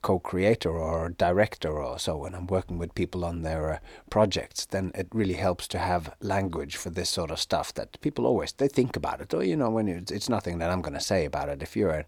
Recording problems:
none

